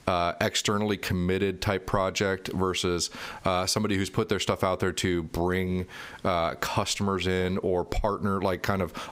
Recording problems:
squashed, flat; somewhat

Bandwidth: 15.5 kHz